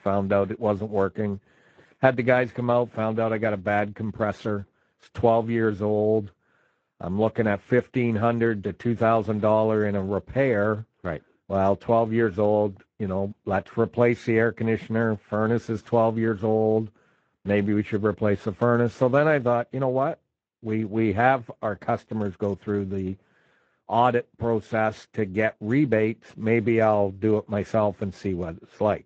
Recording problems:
garbled, watery; slightly; nothing above 7.5 kHz
muffled; very slightly; fading above 3.5 kHz

